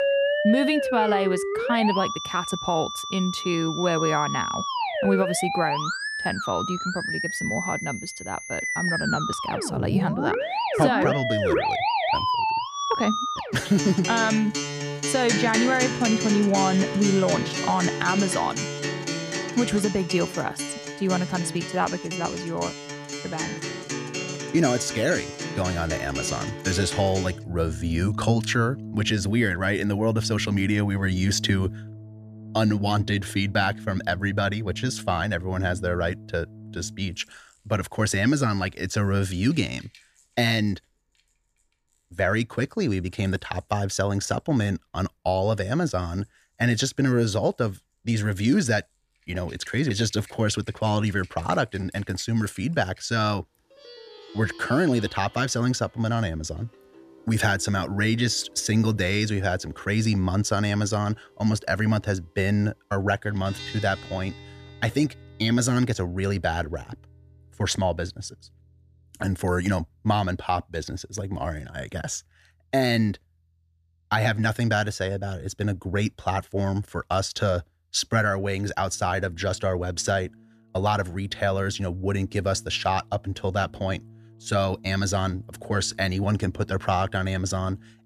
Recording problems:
background music; loud; throughout; 4 dB below the speech

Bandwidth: 14.5 kHz